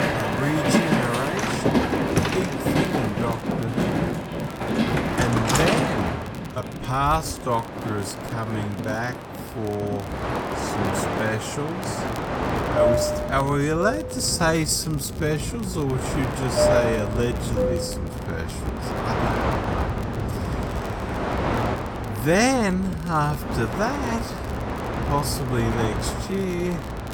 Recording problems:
wrong speed, natural pitch; too slow; 0.5 times normal speed
train or aircraft noise; very loud; throughout; as loud as the speech
crackle, like an old record; faint; 20 dB below the speech

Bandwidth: 17.5 kHz